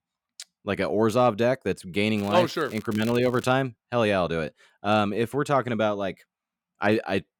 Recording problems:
crackling; faint; from 2 to 3.5 s; 20 dB below the speech

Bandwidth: 18 kHz